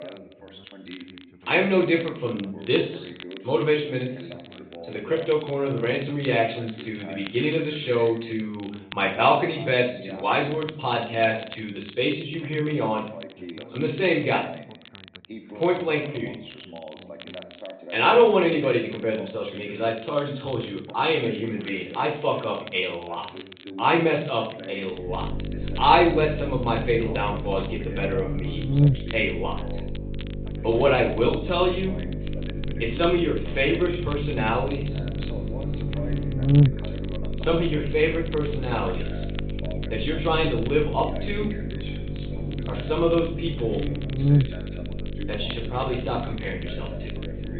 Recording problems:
off-mic speech; far
high frequencies cut off; severe; nothing above 4 kHz
room echo; slight; dies away in 0.5 s
electrical hum; noticeable; from 25 s on; 50 Hz, 15 dB below the speech
background chatter; noticeable; throughout; 2 voices, 15 dB below the speech
crackle, like an old record; faint; 20 dB below the speech

